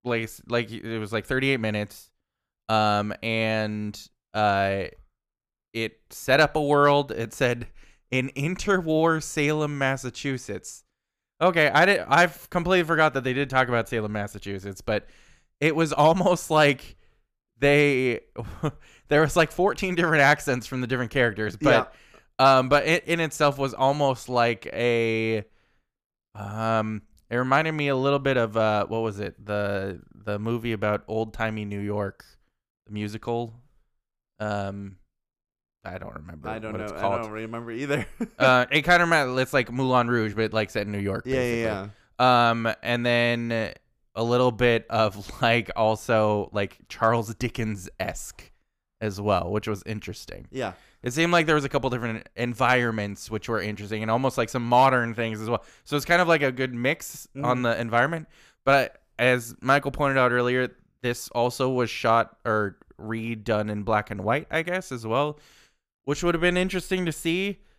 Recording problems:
none

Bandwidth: 15 kHz